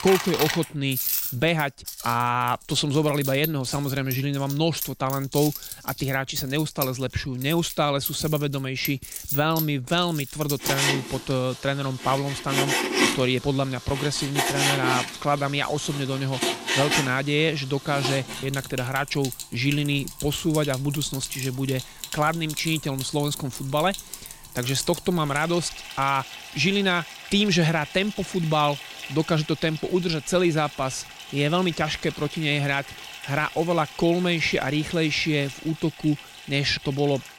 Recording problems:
household noises; loud; throughout; 6 dB below the speech

